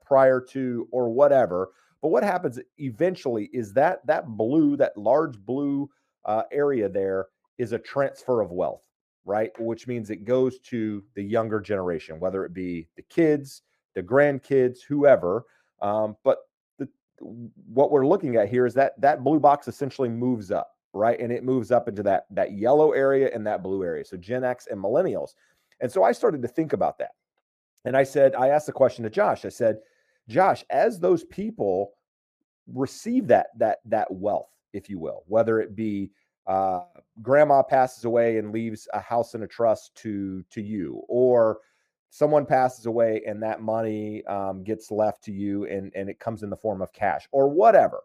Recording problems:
muffled; very; fading above 2 kHz

